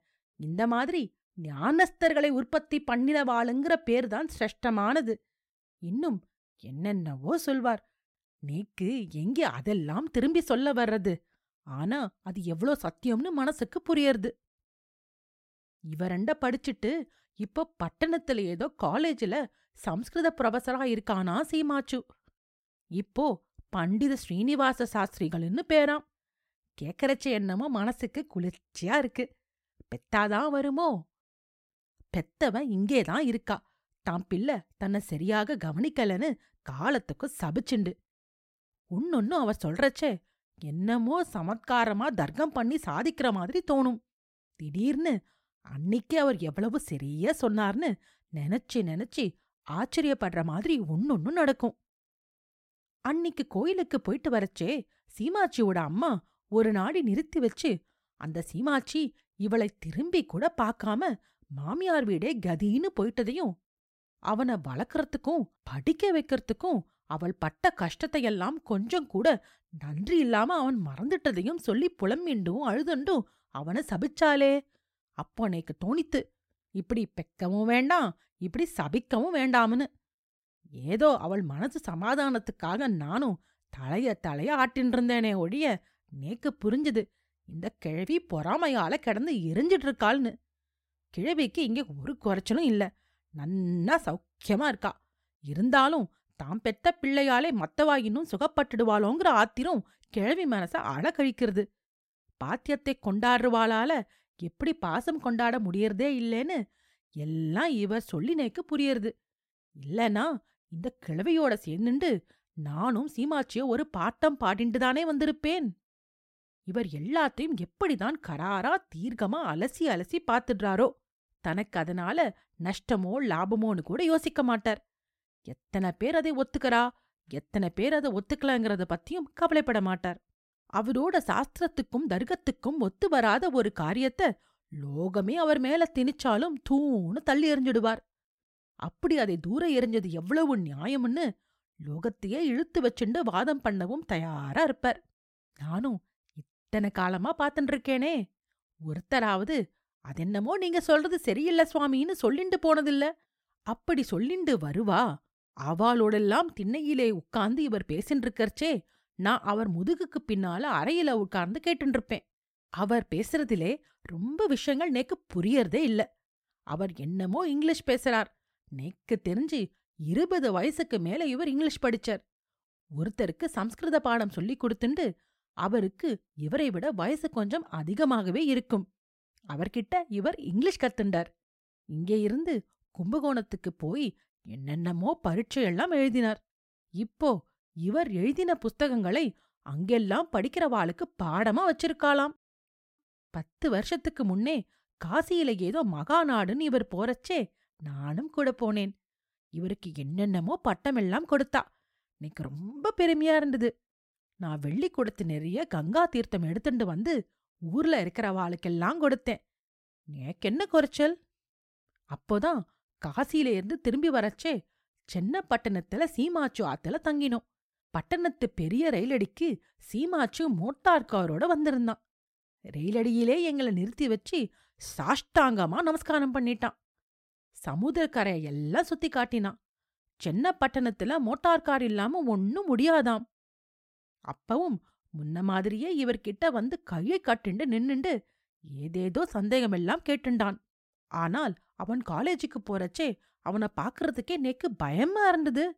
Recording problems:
uneven, jittery; strongly; from 24 s to 3:41

